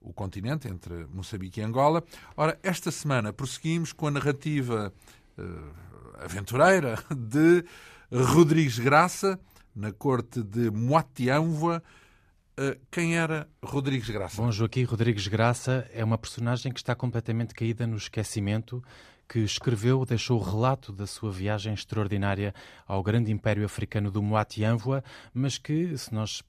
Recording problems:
none

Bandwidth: 14.5 kHz